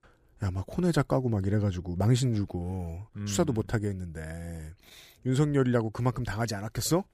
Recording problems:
none

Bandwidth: 15 kHz